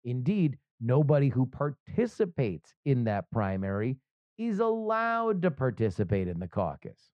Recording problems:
muffled; very; fading above 1.5 kHz

